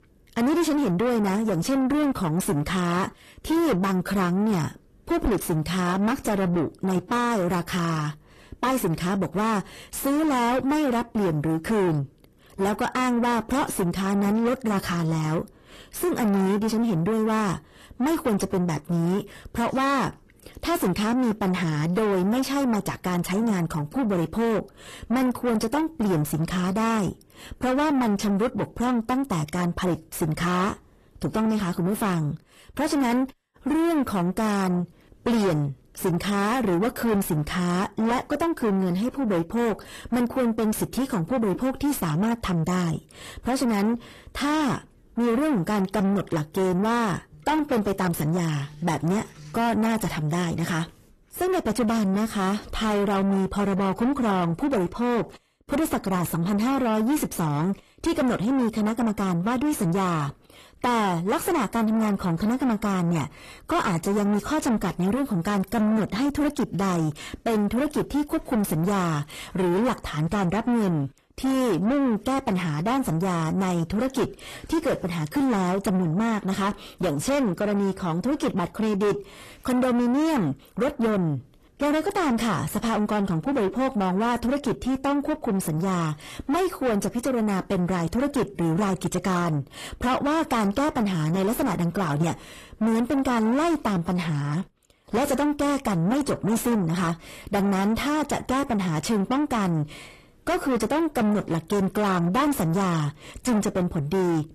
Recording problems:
distortion; heavy; 7 dB below the speech
garbled, watery; slightly; nothing above 14 kHz

